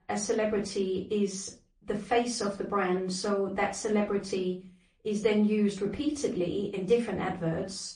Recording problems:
off-mic speech; far
room echo; slight; dies away in 0.3 s
garbled, watery; slightly; nothing above 9 kHz

